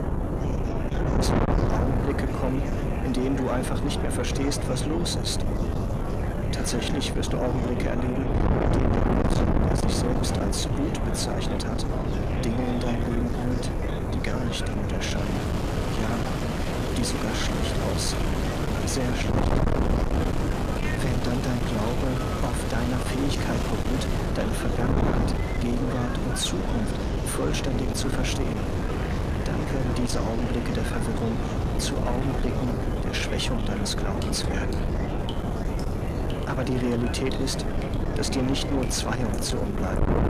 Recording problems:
distortion; heavy; 6 dB below the speech
wind noise on the microphone; heavy; 2 dB below the speech
rain or running water; loud; from 15 s on; 7 dB below the speech
murmuring crowd; loud; throughout; 8 dB below the speech
electrical hum; faint; throughout; 50 Hz, 25 dB below the speech

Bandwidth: 14.5 kHz